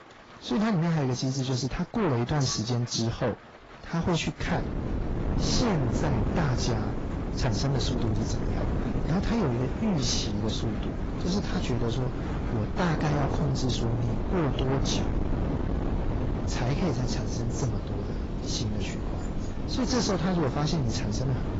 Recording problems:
distortion; heavy; 8 dB below the speech
garbled, watery; badly; nothing above 7.5 kHz
wind noise on the microphone; heavy; from 4.5 s on; 5 dB below the speech
rain or running water; noticeable; throughout; 15 dB below the speech

